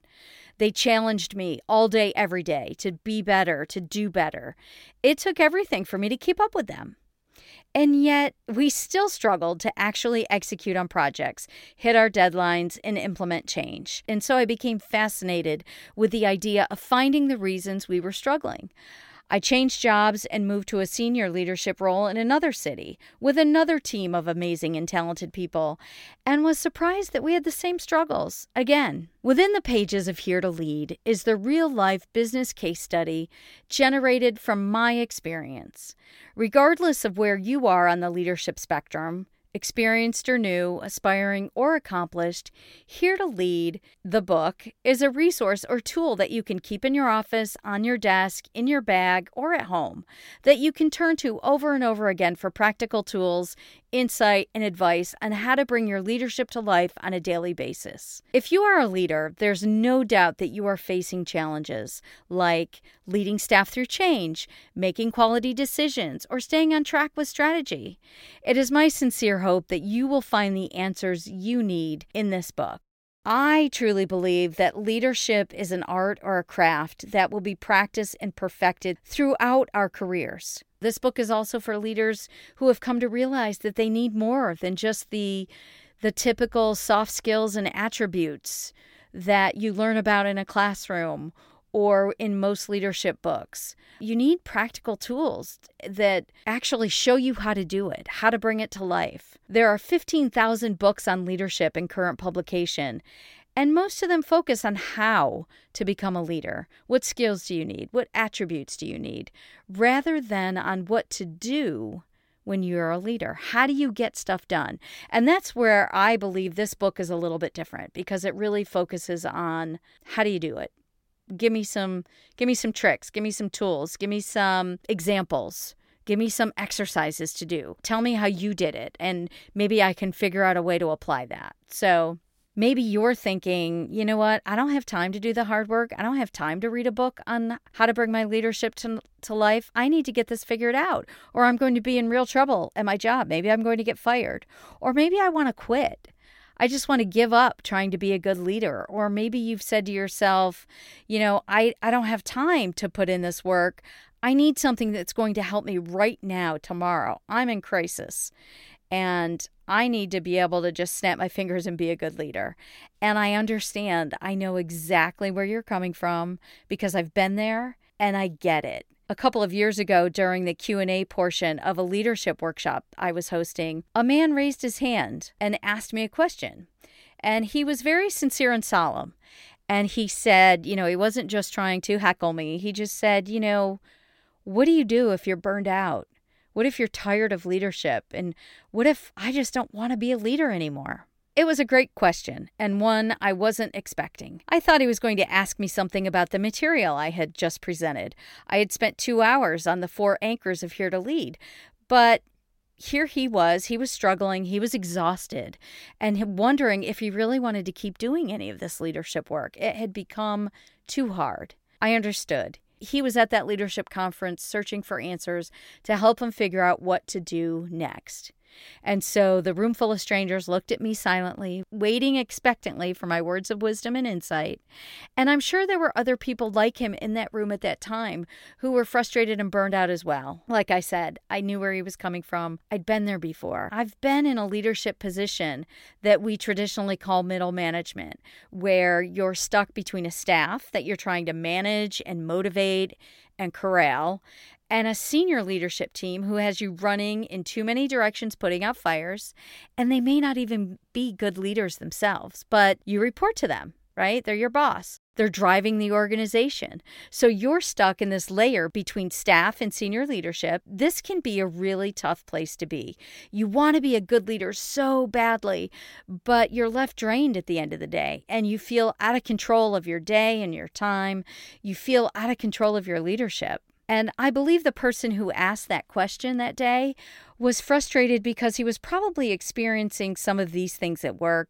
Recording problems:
none

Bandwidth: 16.5 kHz